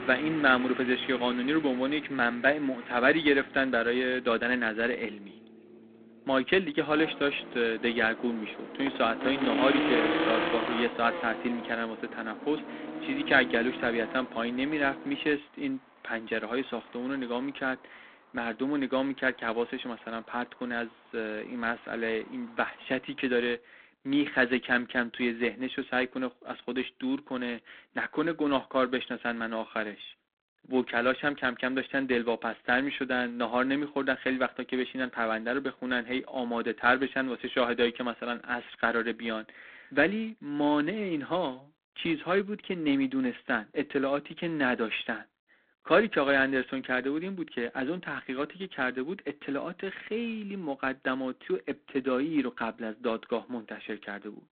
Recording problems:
phone-call audio; poor line
traffic noise; loud; until 23 s; 6 dB below the speech

